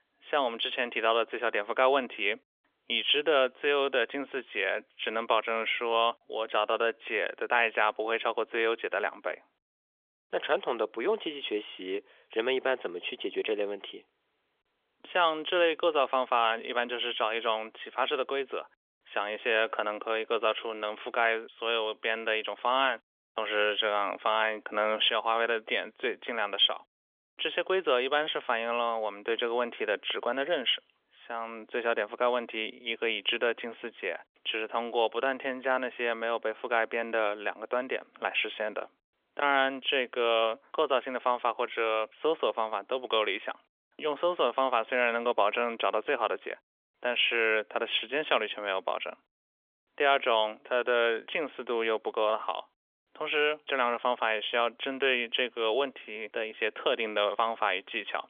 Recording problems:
phone-call audio; nothing above 3.5 kHz

